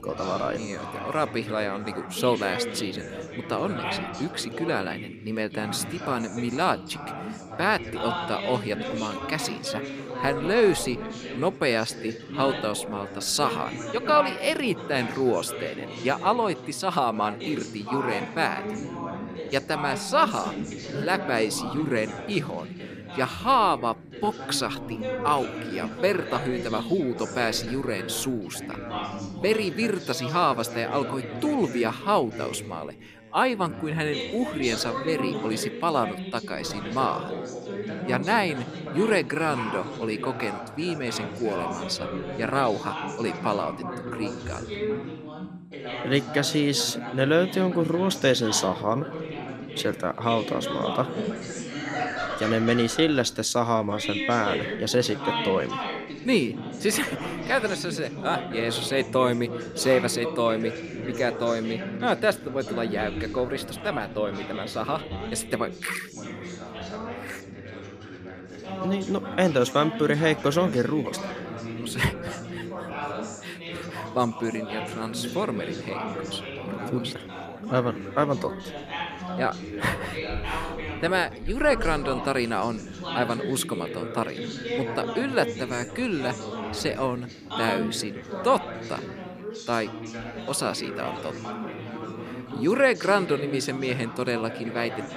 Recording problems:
background chatter; loud; throughout; 3 voices, 7 dB below the speech

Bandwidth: 14.5 kHz